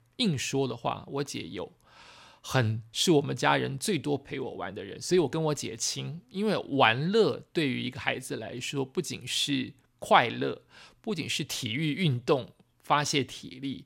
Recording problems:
none

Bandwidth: 16 kHz